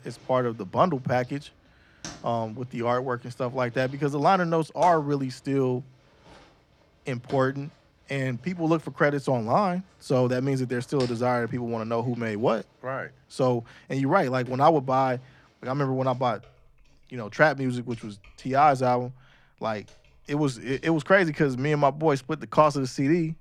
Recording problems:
household noises; faint; throughout; 25 dB below the speech

